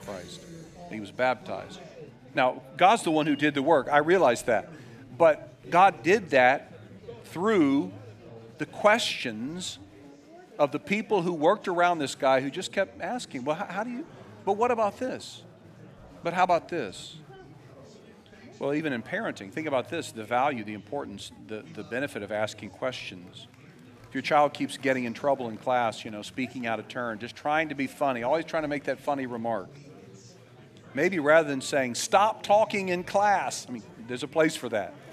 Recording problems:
chatter from many people; faint; throughout; 20 dB below the speech

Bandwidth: 14.5 kHz